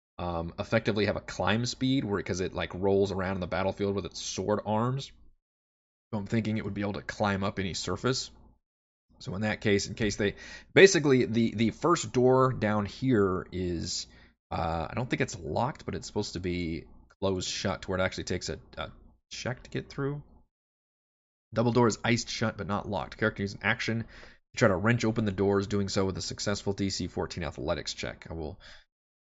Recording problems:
high frequencies cut off; noticeable; nothing above 8 kHz

